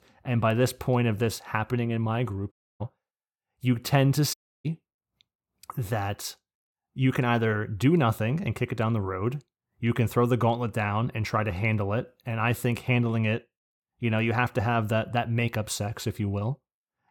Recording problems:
audio cutting out; at 2.5 s and at 4.5 s

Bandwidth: 17 kHz